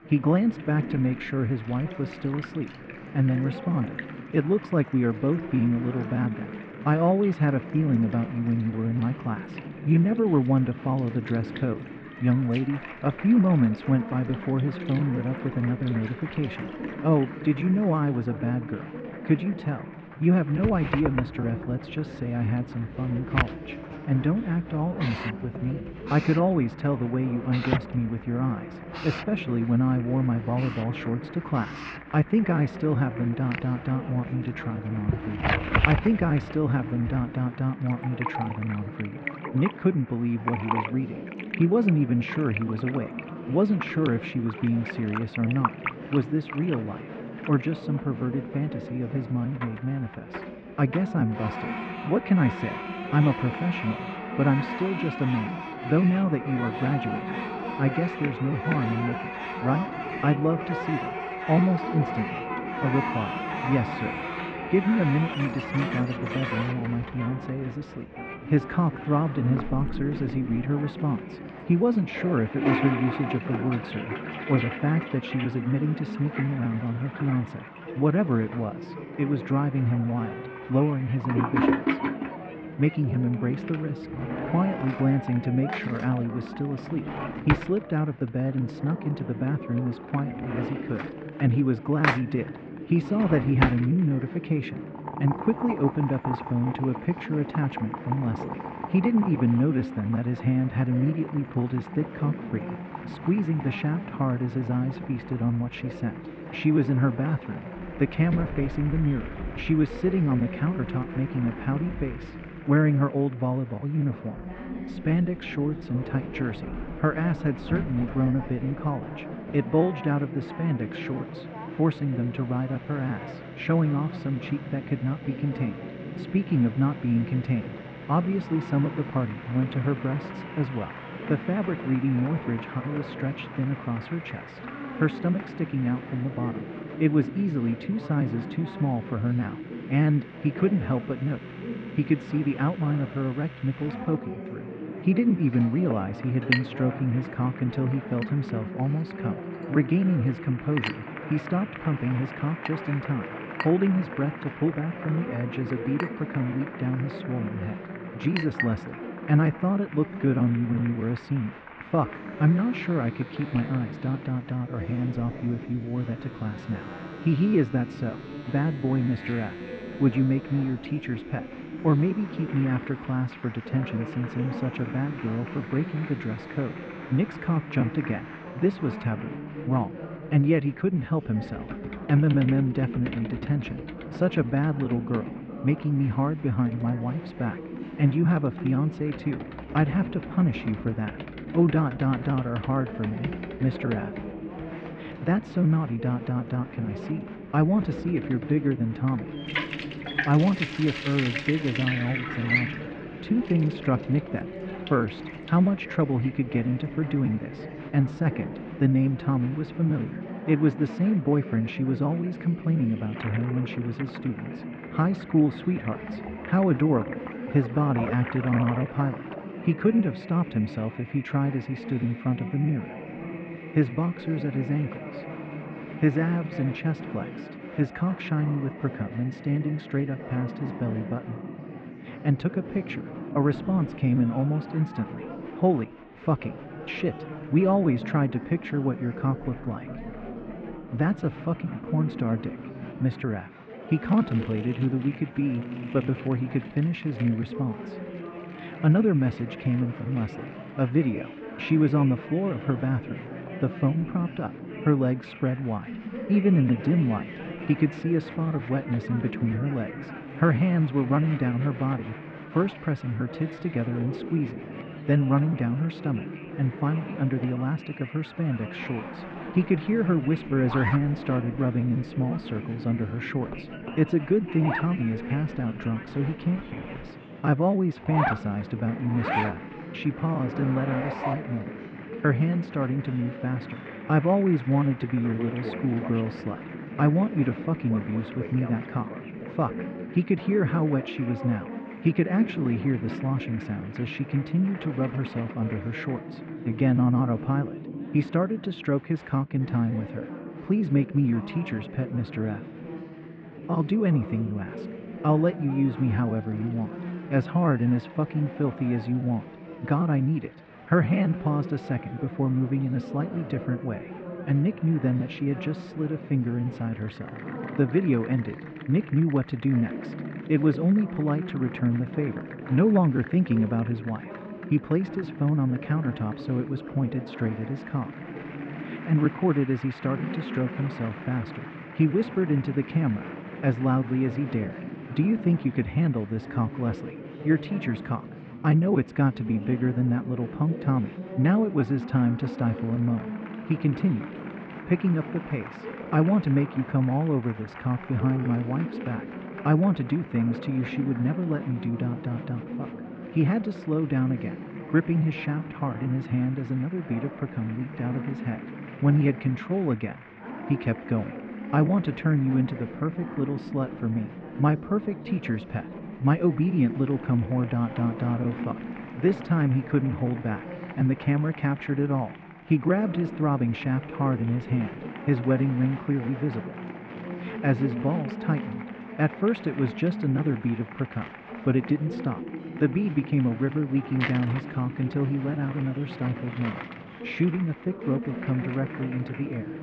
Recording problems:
muffled; very; fading above 2.5 kHz
household noises; noticeable; throughout; 10 dB below the speech
chatter from many people; noticeable; throughout; 10 dB below the speech

